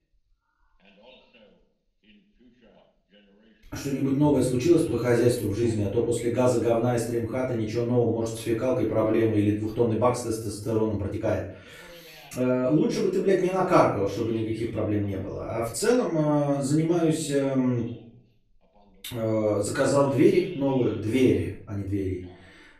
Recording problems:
off-mic speech; far
room echo; noticeable; dies away in 0.4 s
voice in the background; faint; throughout; 30 dB below the speech
uneven, jittery; strongly; from 3.5 to 22 s

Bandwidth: 14 kHz